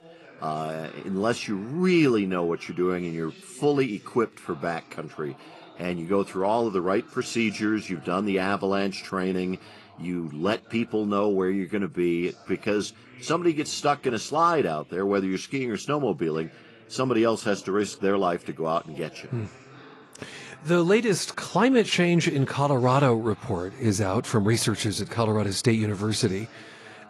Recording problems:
garbled, watery; slightly; nothing above 11.5 kHz
voice in the background; faint; throughout; 25 dB below the speech

